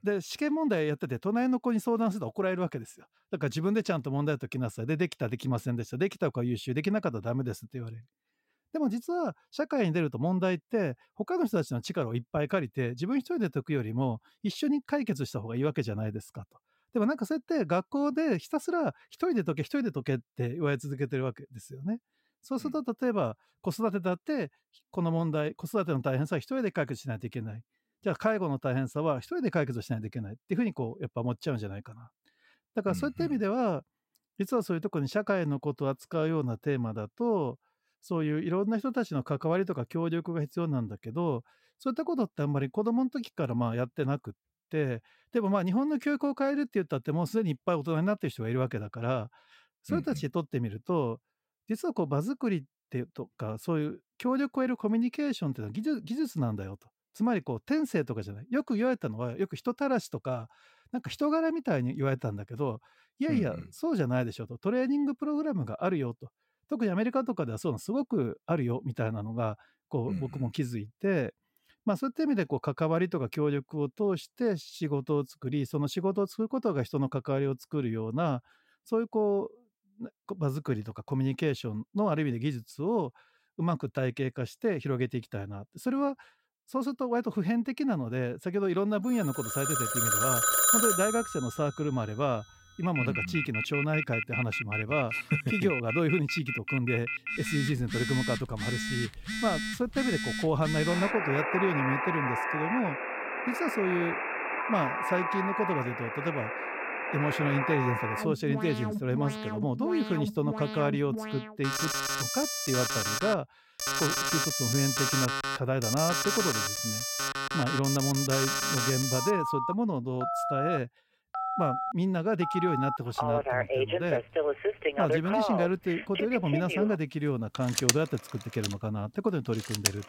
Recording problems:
alarms or sirens; very loud; from 1:30 on; as loud as the speech

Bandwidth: 16 kHz